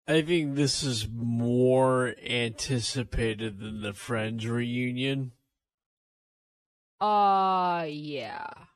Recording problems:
wrong speed, natural pitch; too slow; 0.5 times normal speed

